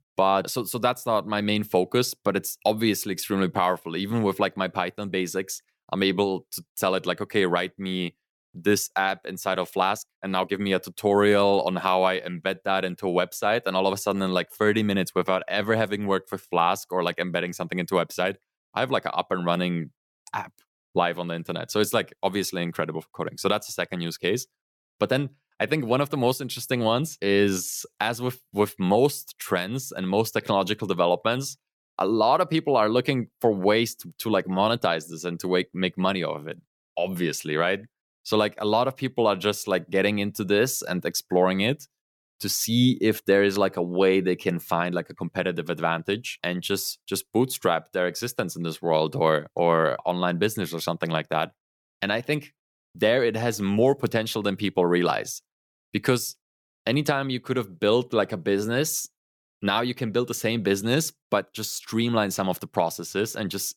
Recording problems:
uneven, jittery; strongly; from 9.5 to 28 s

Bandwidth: 18.5 kHz